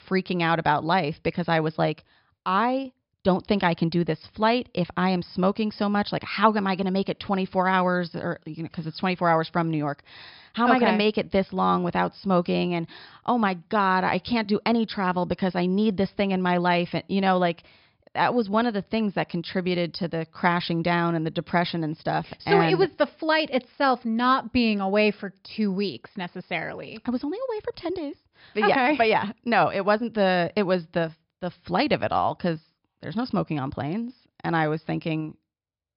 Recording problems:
high frequencies cut off; noticeable; nothing above 5.5 kHz

